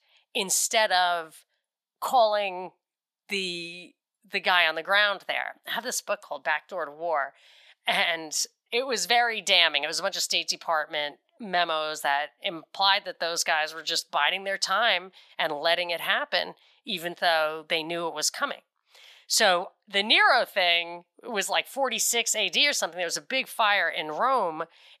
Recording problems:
thin; somewhat; fading below 500 Hz

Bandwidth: 14.5 kHz